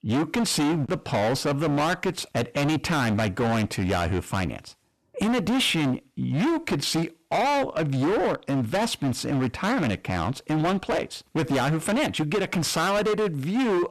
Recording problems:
distortion; heavy; 27% of the sound clipped

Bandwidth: 13.5 kHz